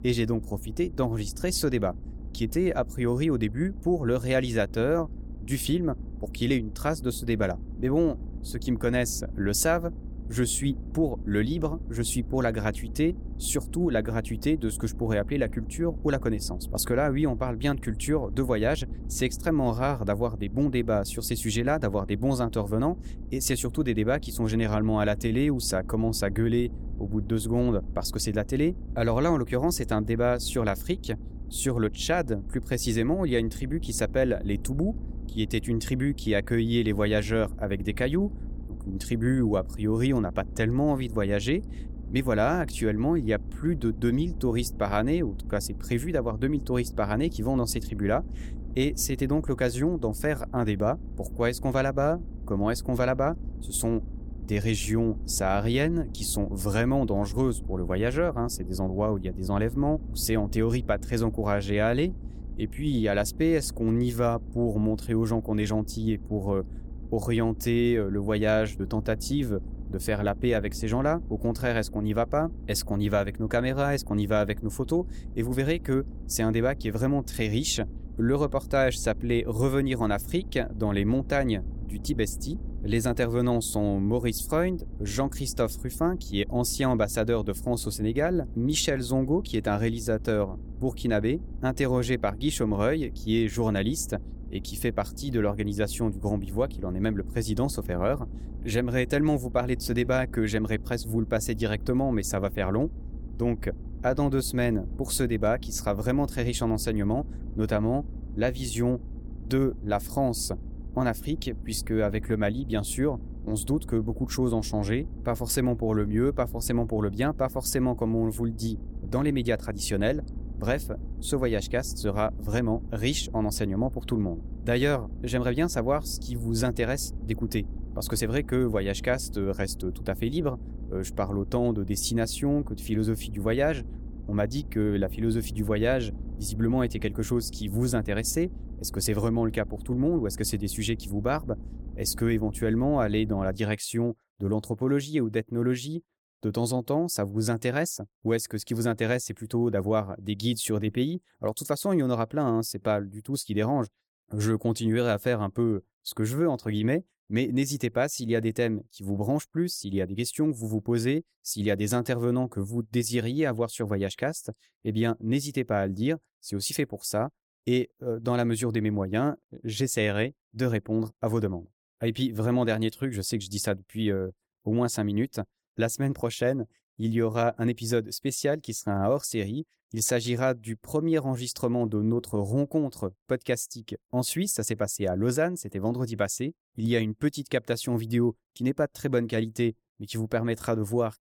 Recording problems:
low rumble; faint; until 2:24; 20 dB below the speech

